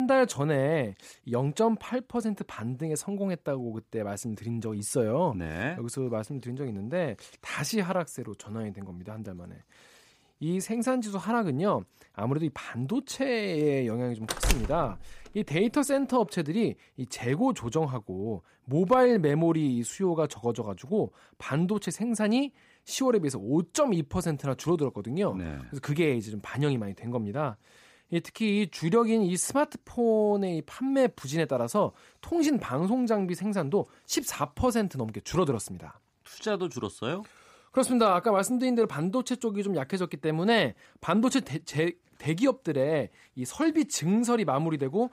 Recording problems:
abrupt cut into speech; at the start
door banging; noticeable; at 14 s; peak level with the speech

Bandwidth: 15 kHz